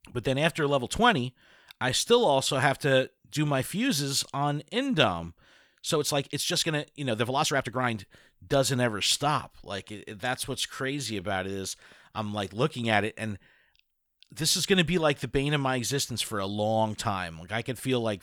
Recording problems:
uneven, jittery; strongly; from 2 to 11 s

